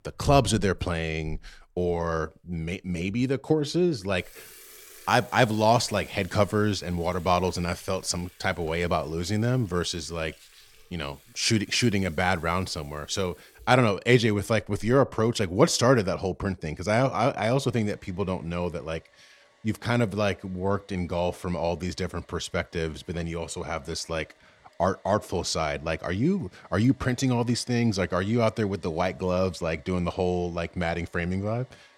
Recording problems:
household noises; faint; throughout; 25 dB below the speech

